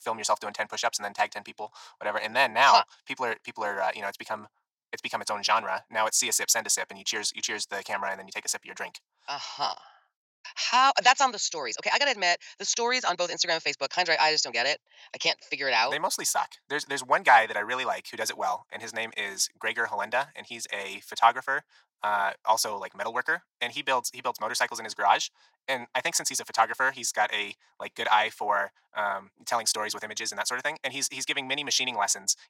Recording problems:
thin; very; fading below 600 Hz
wrong speed, natural pitch; too fast; 1.5 times normal speed

